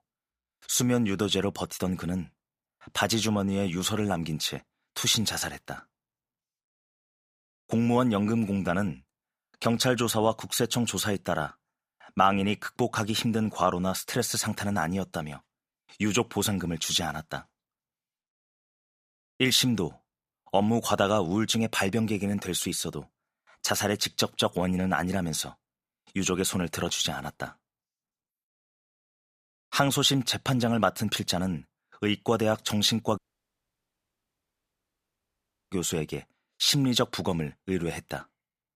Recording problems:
audio cutting out; at 33 s for 2.5 s

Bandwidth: 15 kHz